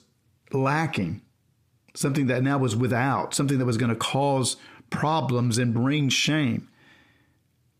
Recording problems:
squashed, flat; heavily

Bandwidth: 15 kHz